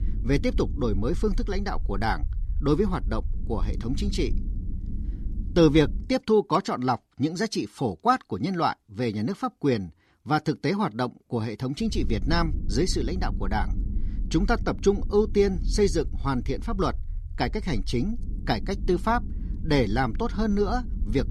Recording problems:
low rumble; faint; until 6 s and from 12 s on; 20 dB below the speech

